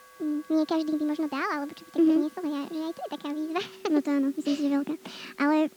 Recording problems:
wrong speed and pitch; too fast and too high; 1.5 times normal speed
muffled; slightly; fading above 3 kHz
background music; faint; throughout; 25 dB below the speech
hiss; faint; throughout; 25 dB below the speech

